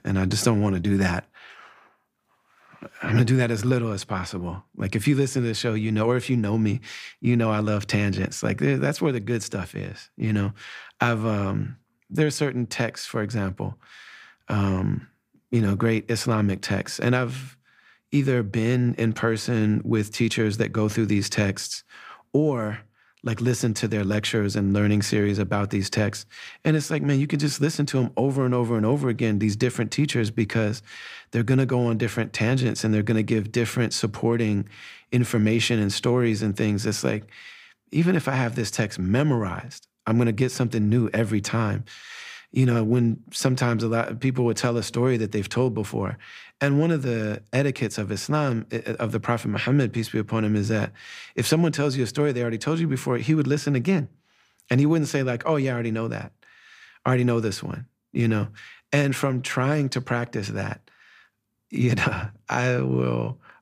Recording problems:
none

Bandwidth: 15 kHz